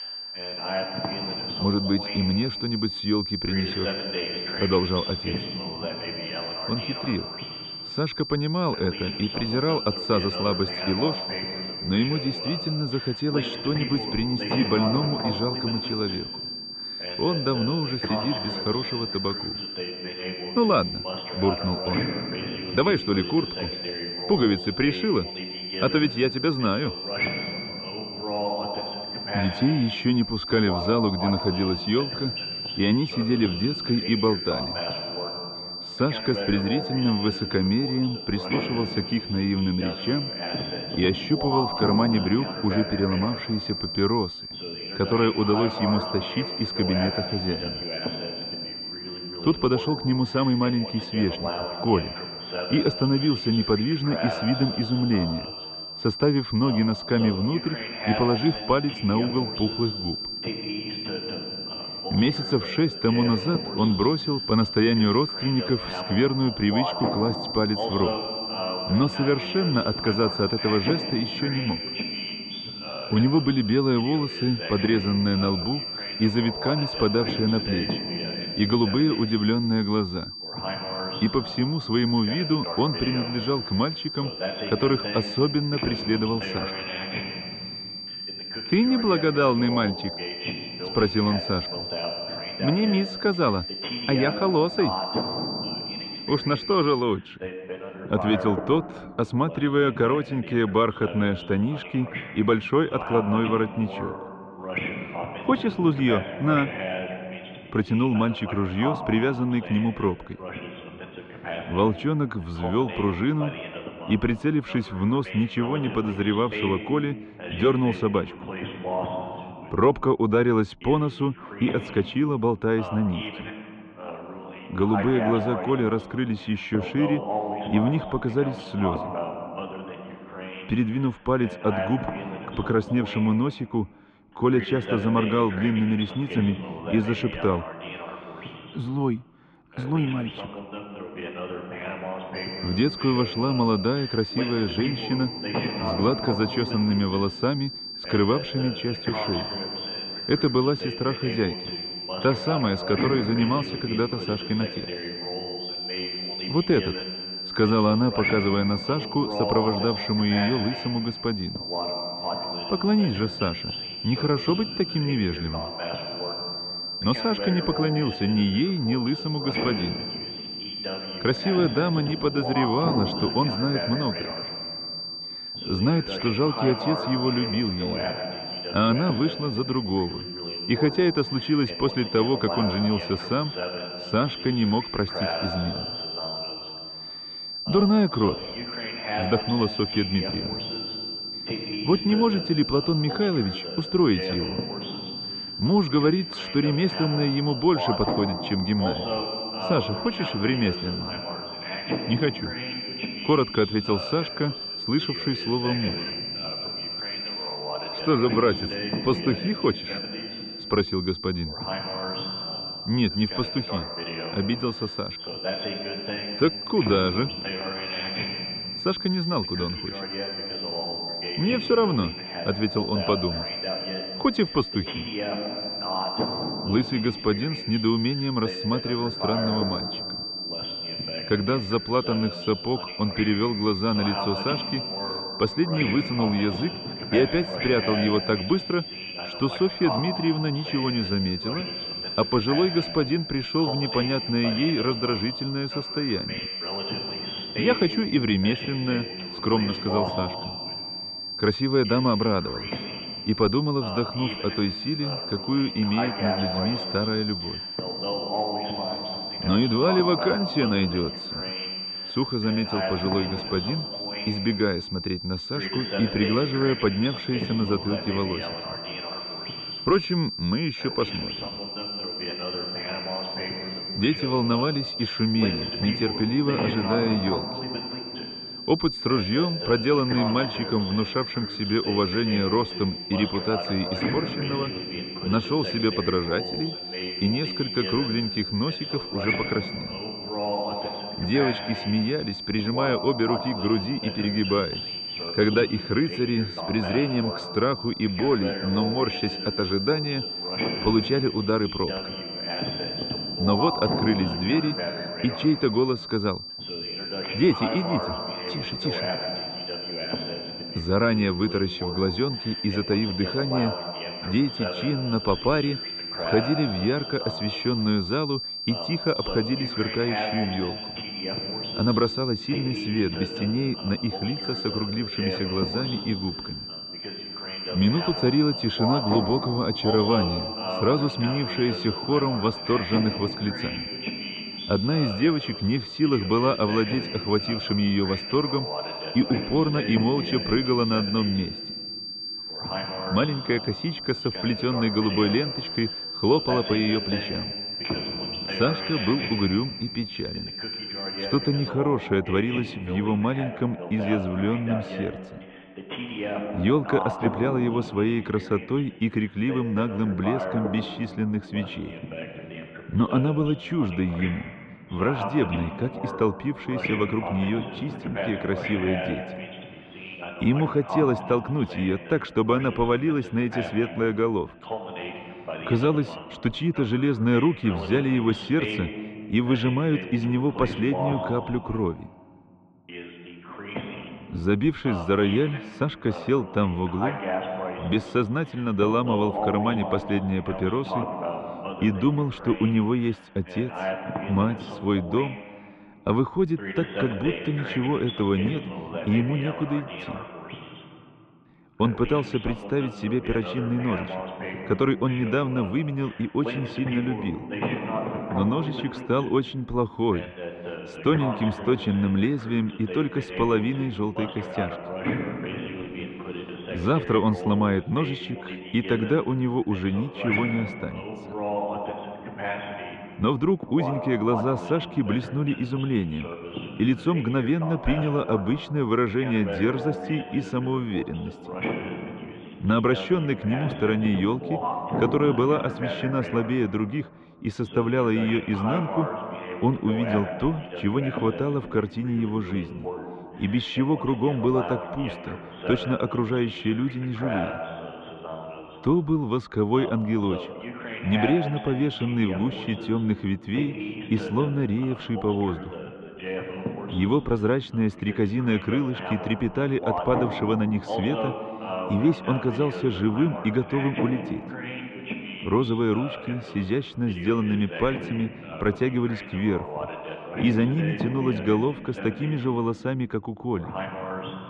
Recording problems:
muffled; very; fading above 3 kHz
high-pitched whine; loud; until 1:37 and from 2:22 to 5:52; 4.5 kHz, 7 dB below the speech
voice in the background; loud; throughout; 9 dB below the speech

